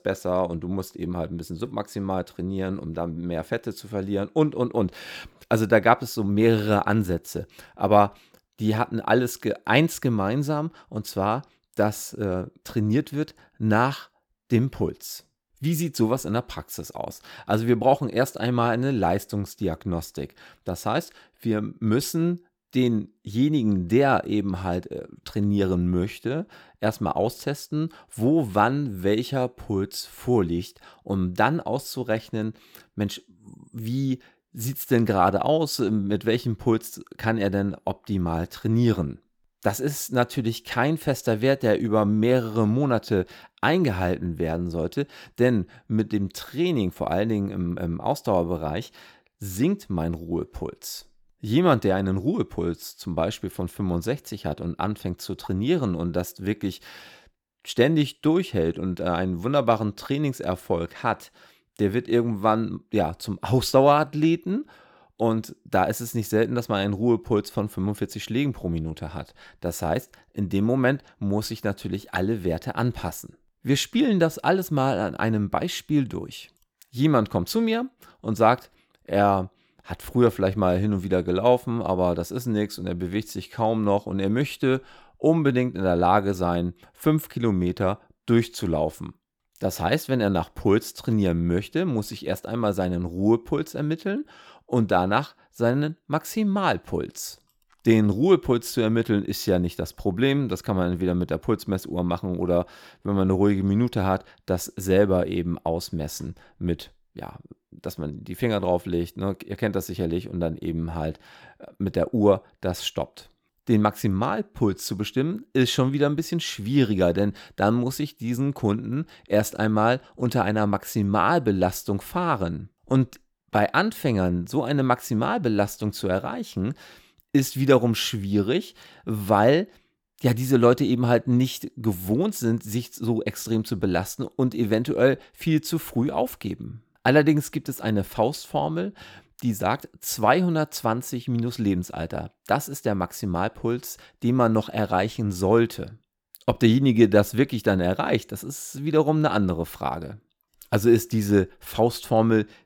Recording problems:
none

